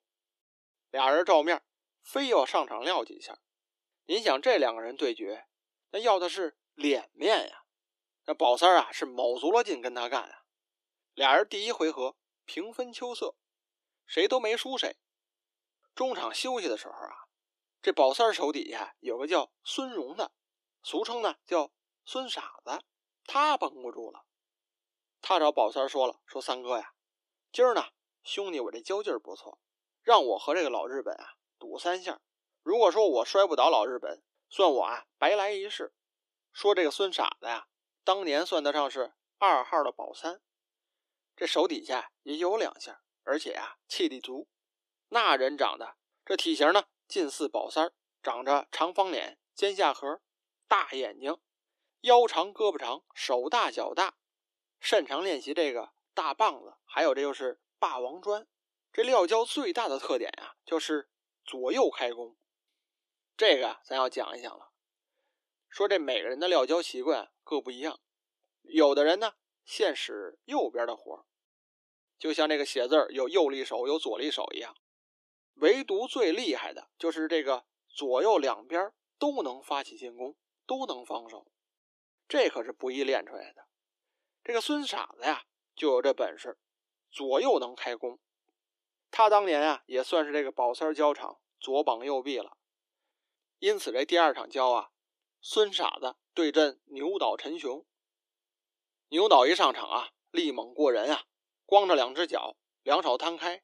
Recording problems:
thin; somewhat; fading below 300 Hz

